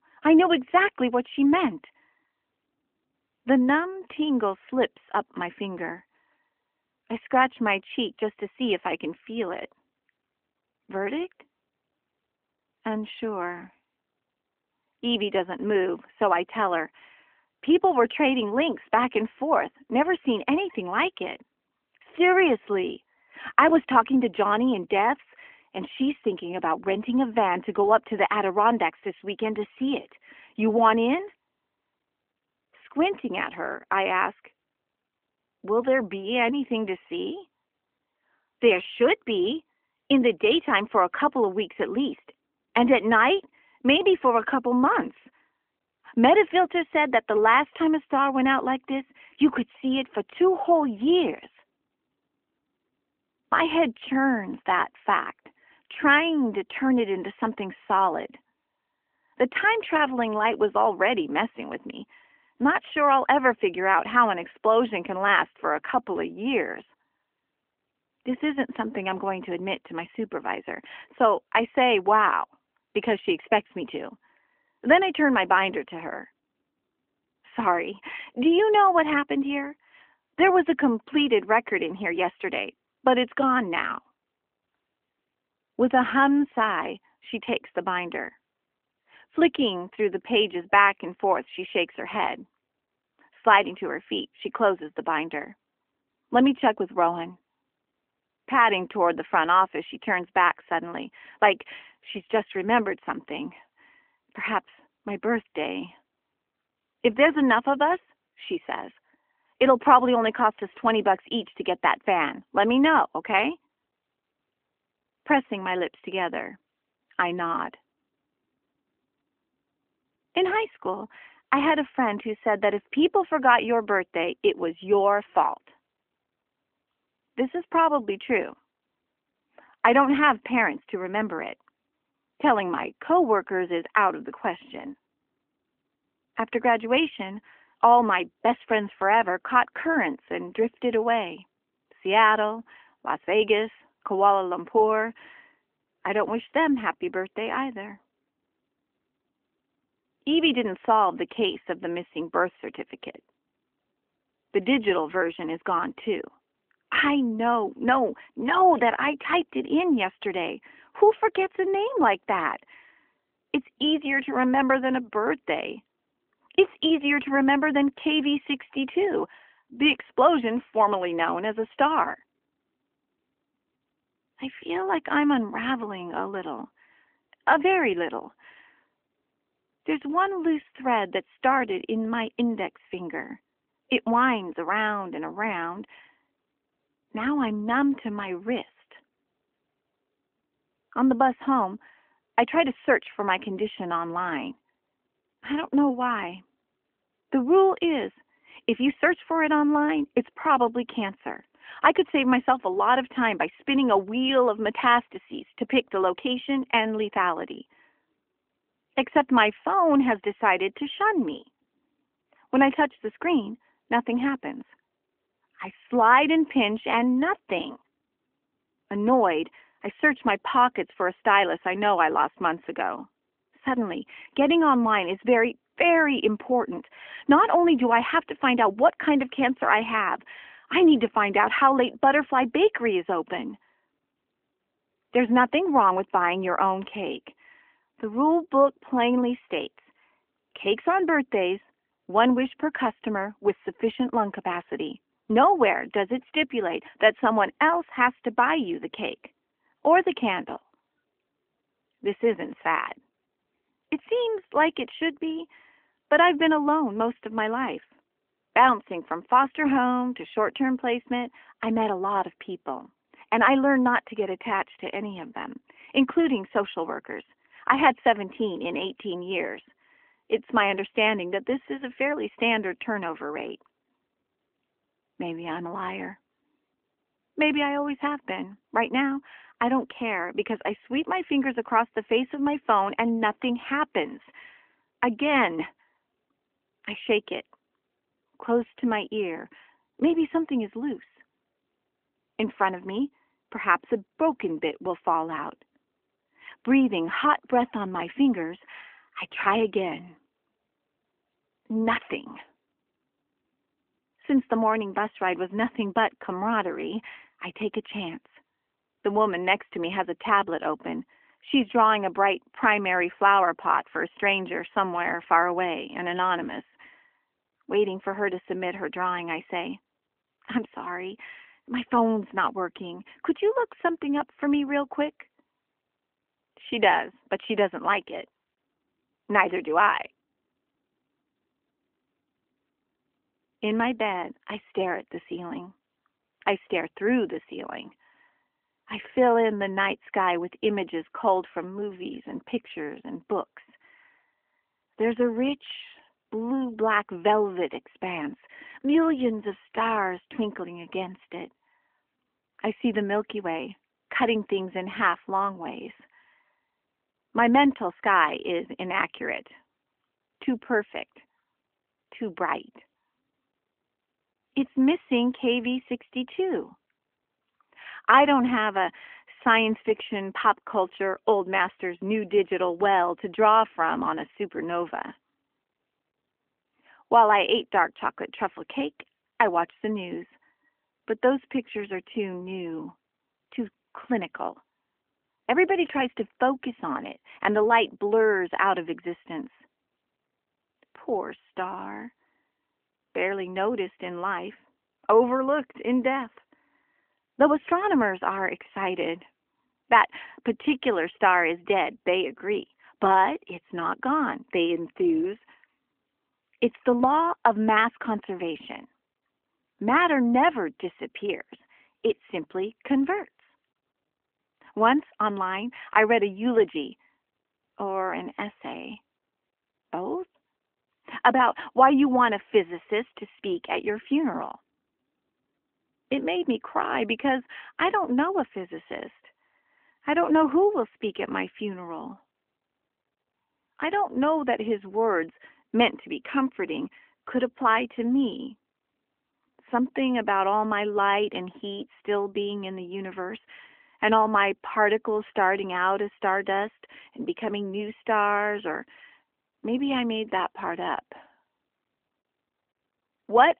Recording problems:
phone-call audio; nothing above 3.5 kHz

